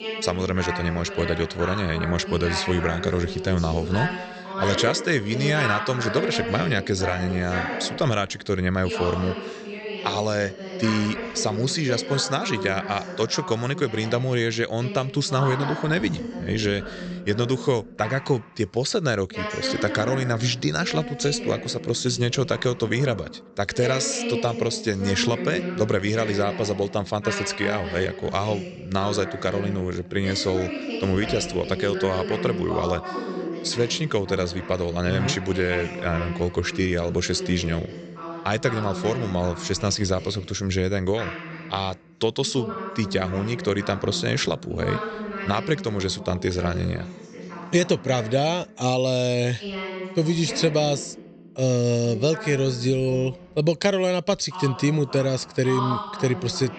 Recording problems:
high frequencies cut off; noticeable; nothing above 8 kHz
voice in the background; loud; throughout; 8 dB below the speech

